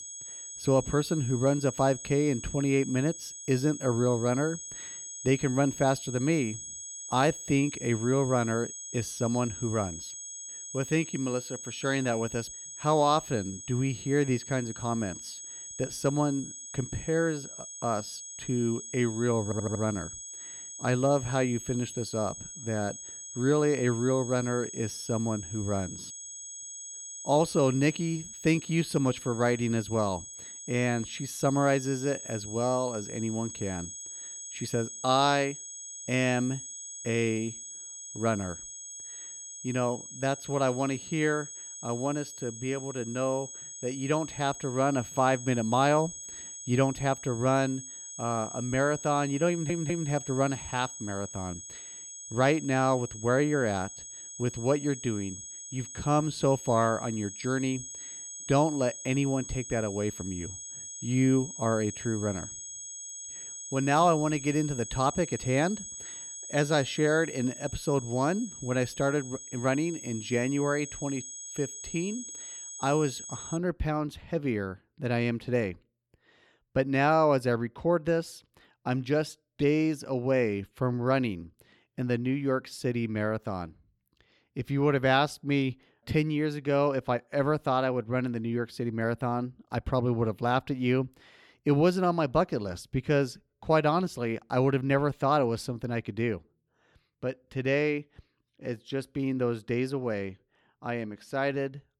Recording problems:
high-pitched whine; noticeable; until 1:14; 6.5 kHz, 10 dB below the speech
audio stuttering; at 19 s and at 50 s

